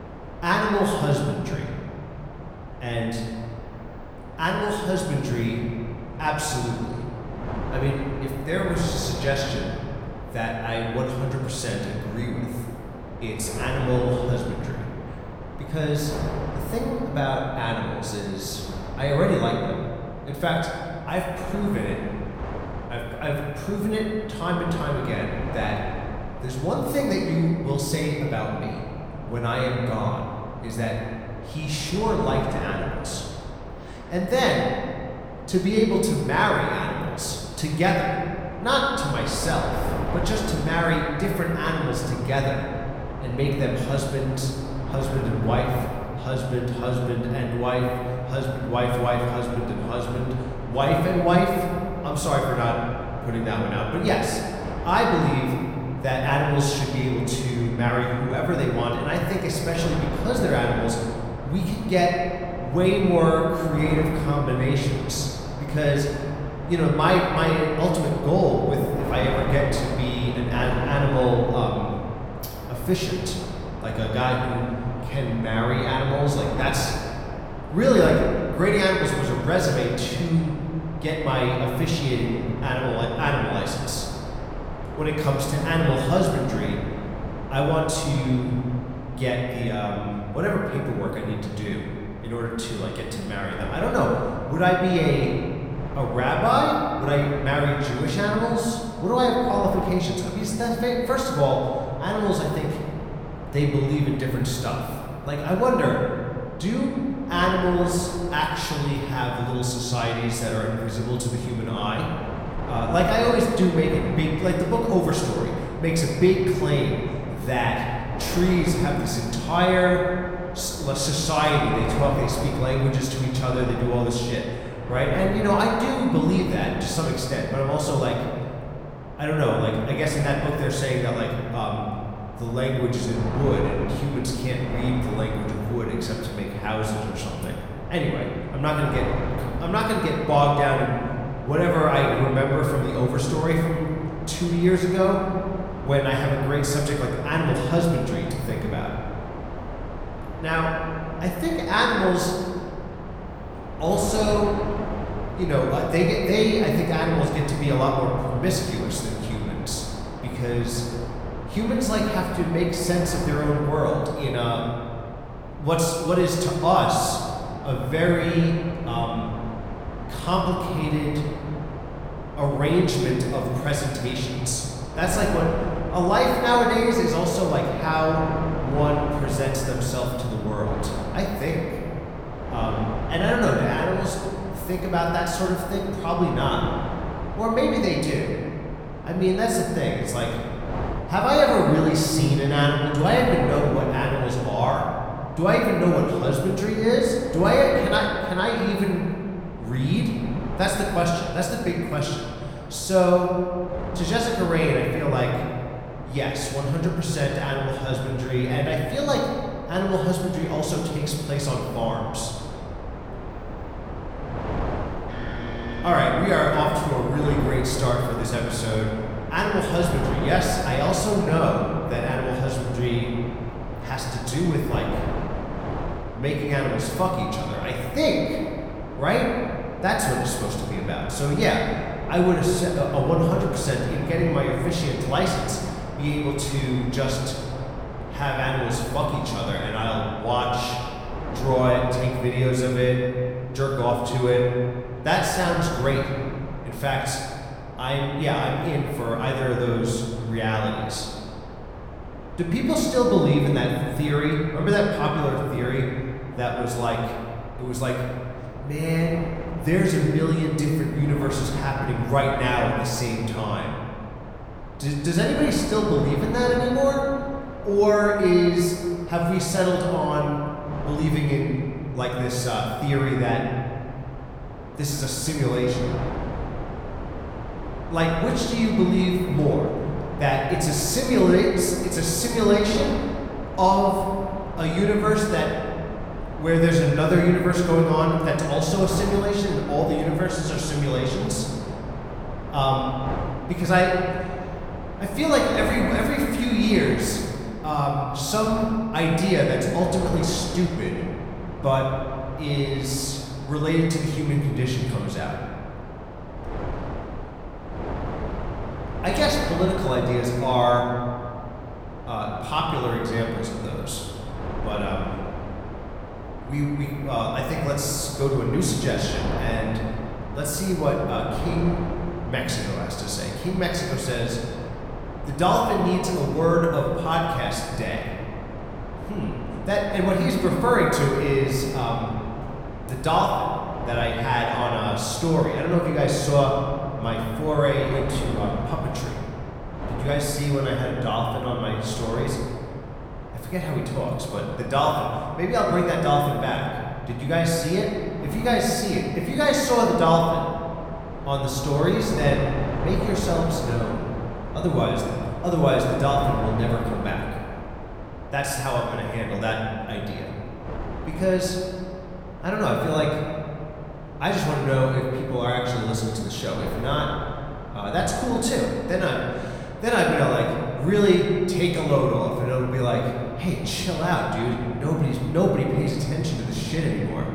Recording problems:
room echo; noticeable; dies away in 1.8 s
off-mic speech; somewhat distant
wind noise on the microphone; occasional gusts; 10 dB below the speech

